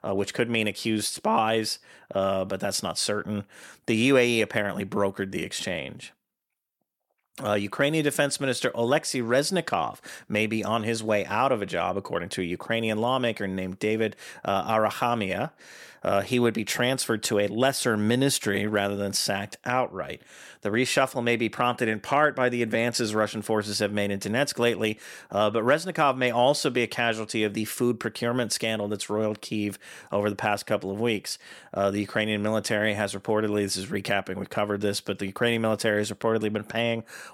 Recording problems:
none

